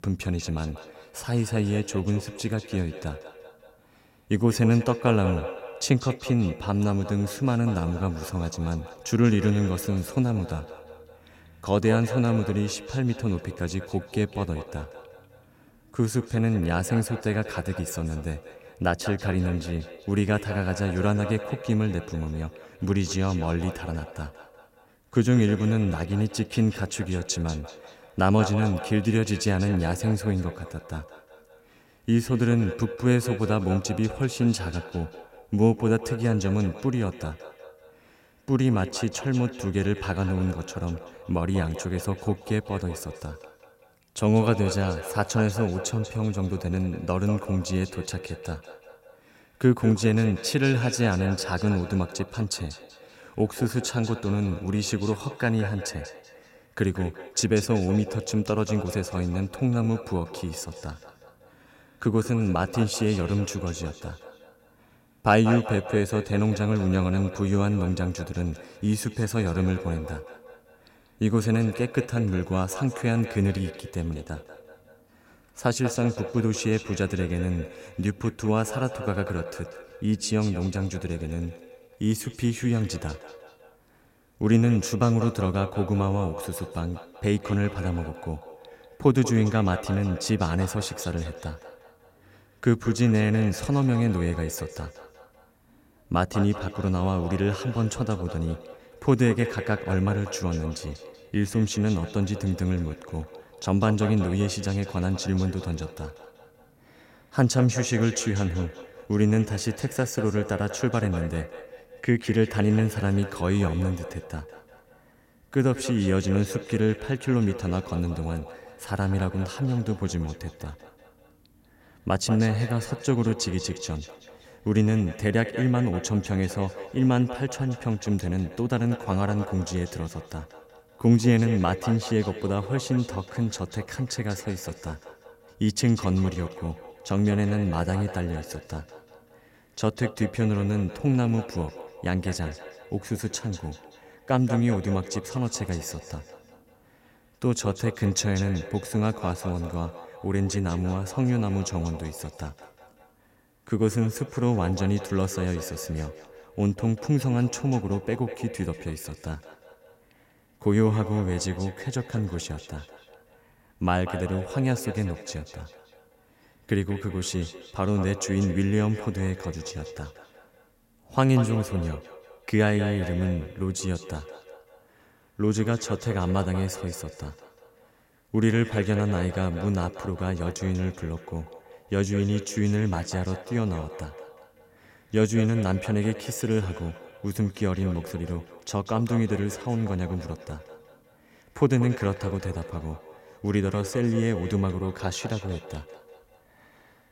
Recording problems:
echo of what is said; noticeable; throughout; 190 ms later, 15 dB below the speech

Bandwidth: 16 kHz